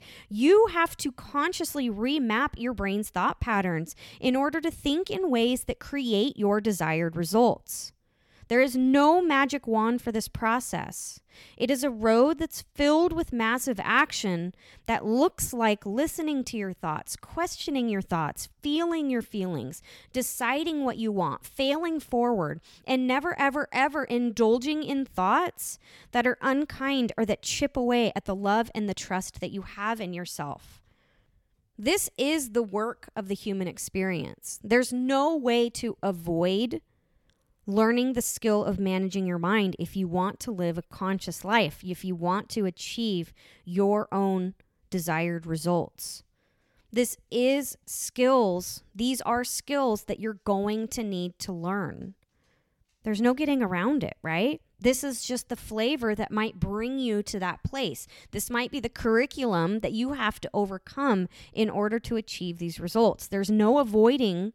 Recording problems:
none

